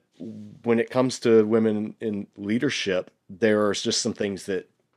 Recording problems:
none

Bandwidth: 14.5 kHz